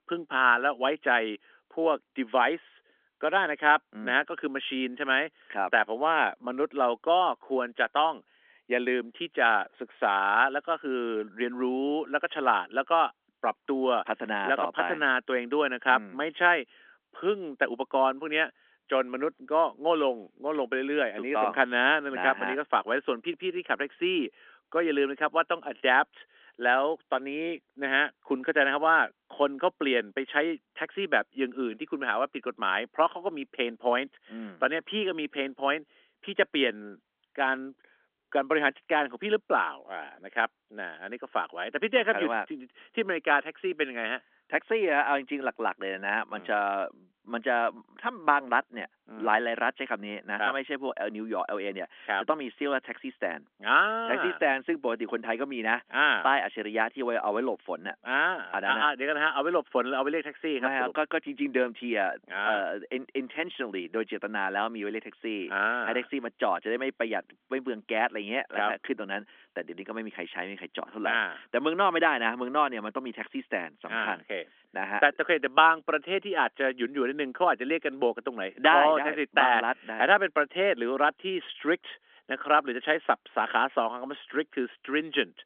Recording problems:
thin; somewhat; fading below 250 Hz
phone-call audio; nothing above 3.5 kHz

